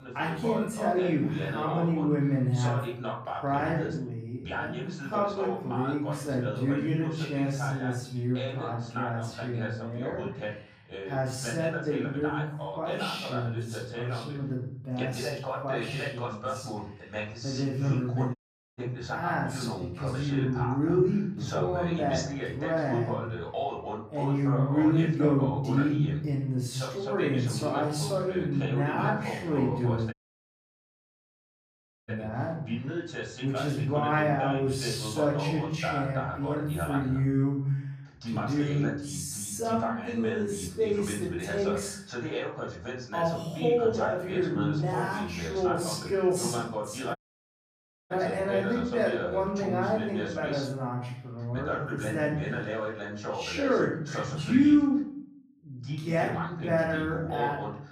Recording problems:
off-mic speech; far
wrong speed, natural pitch; too slow; 0.5 times normal speed
room echo; noticeable; dies away in 0.6 s
voice in the background; loud; throughout; 6 dB below the speech
audio cutting out; at 18 s, at 30 s for 2 s and at 47 s for 1 s

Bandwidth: 15 kHz